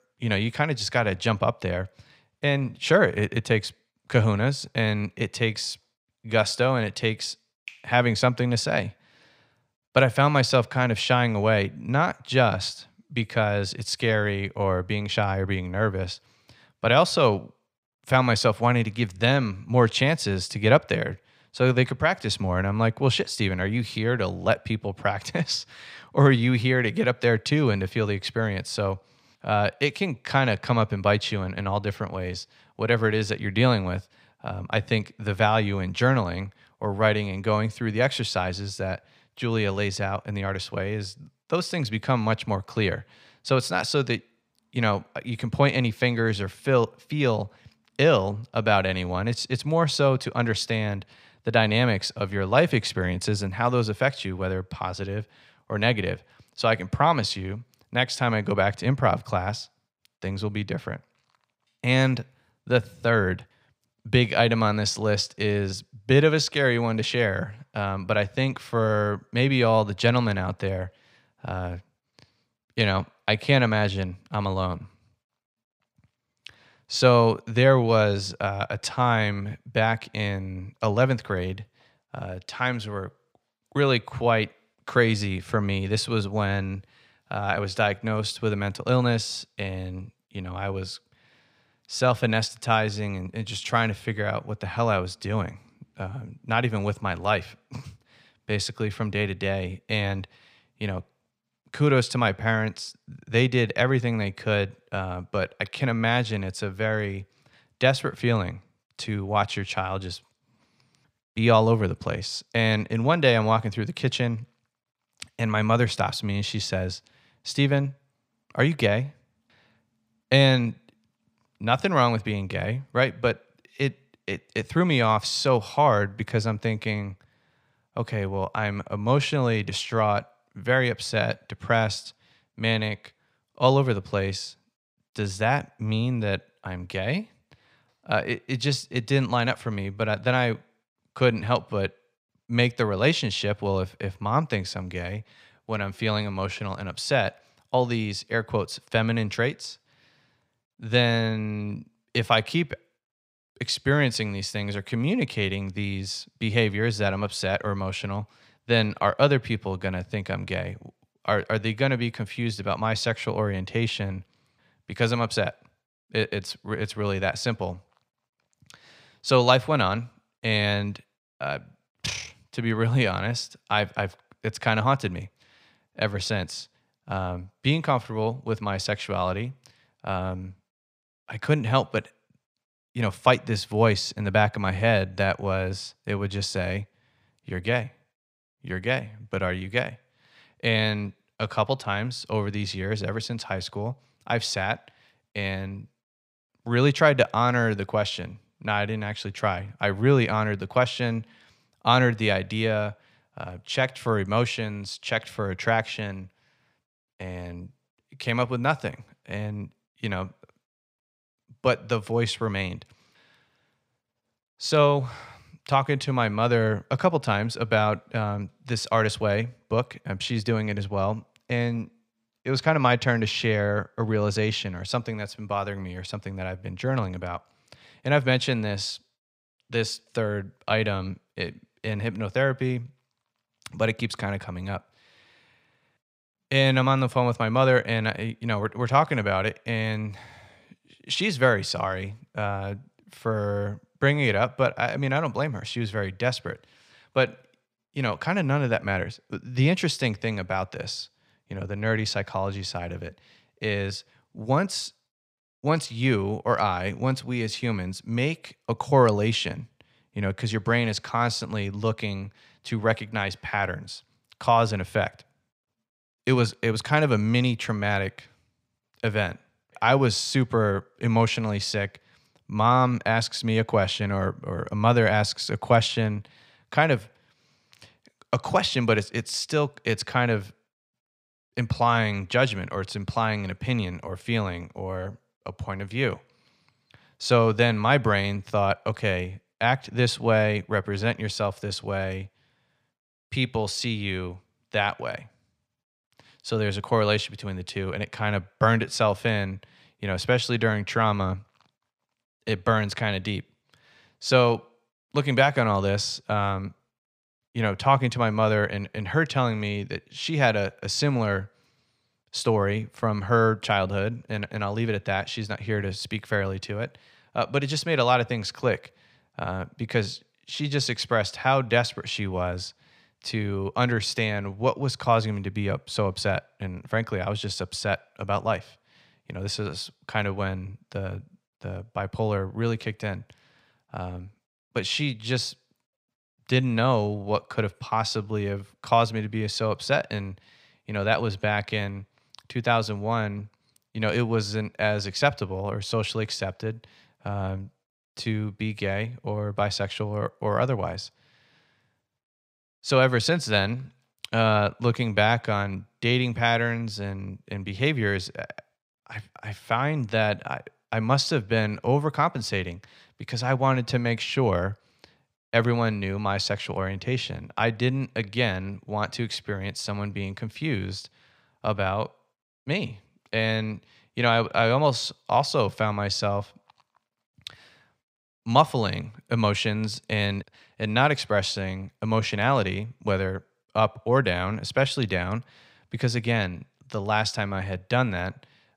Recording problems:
none

